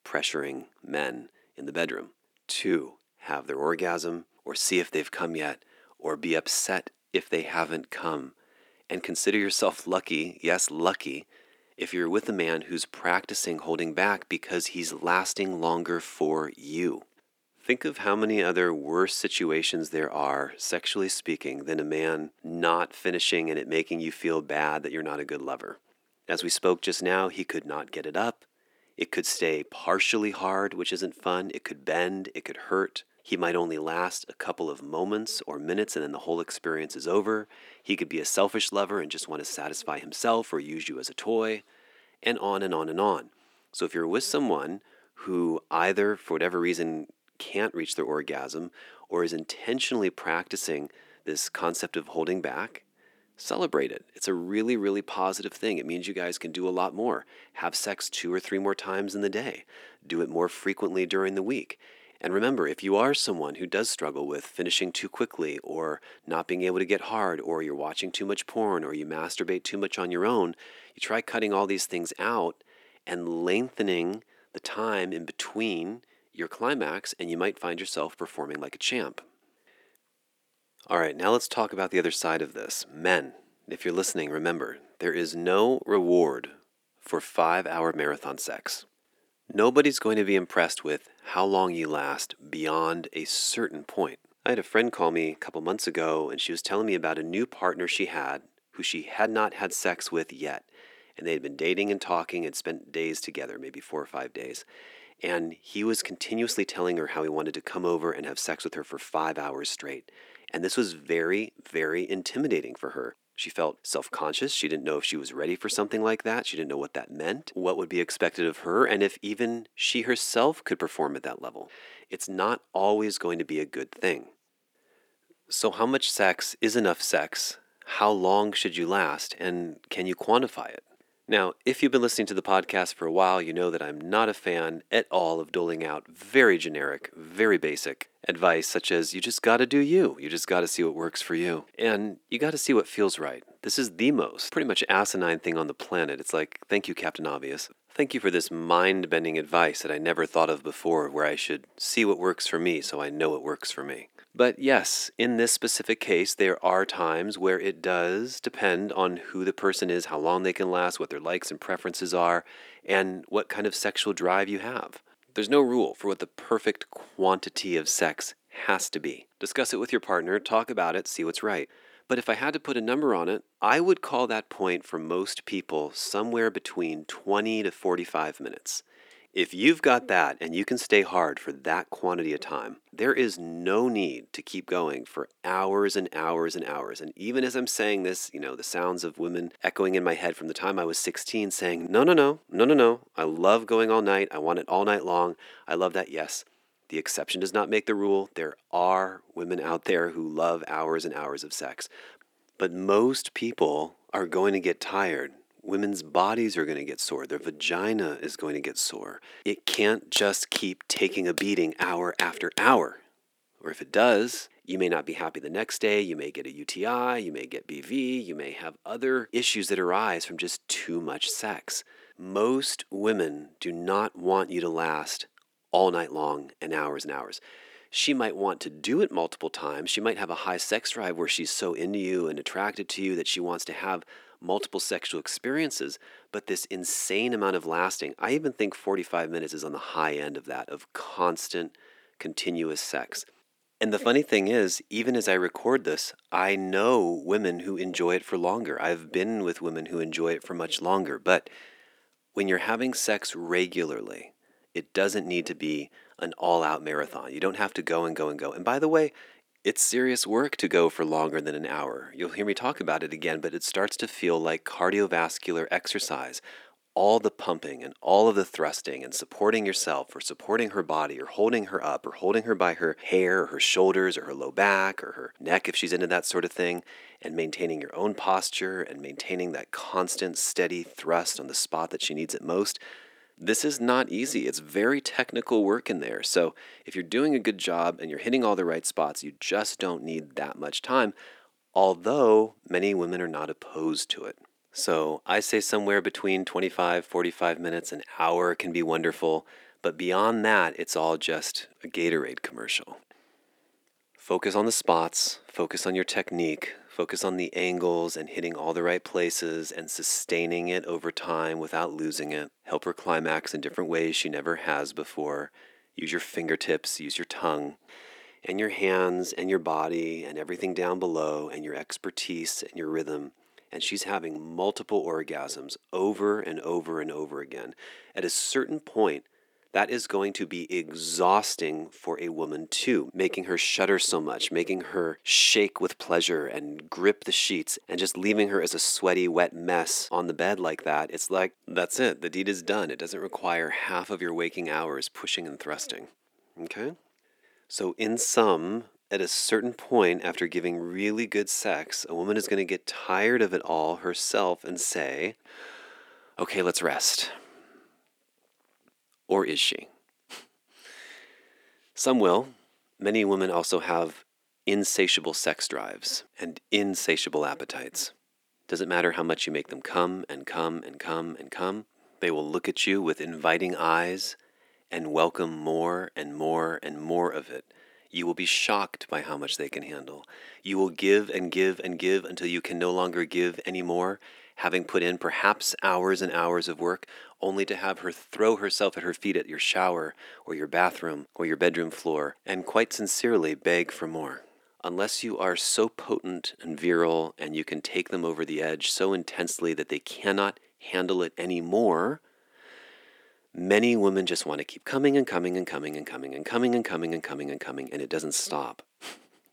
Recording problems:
thin; somewhat; fading below 250 Hz

